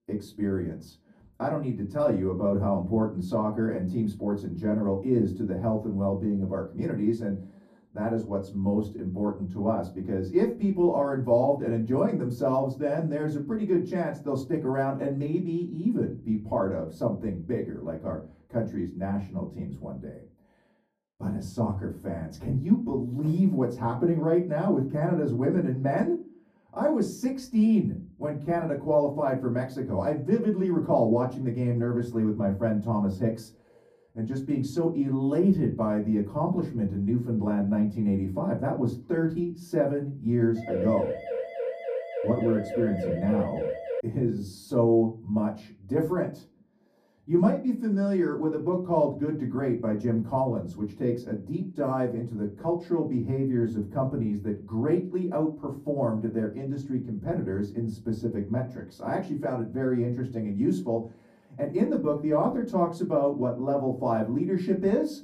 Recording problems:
off-mic speech; far
muffled; very; fading above 1.5 kHz
room echo; very slight; dies away in 0.3 s
siren; noticeable; from 41 to 44 s; peak 4 dB below the speech

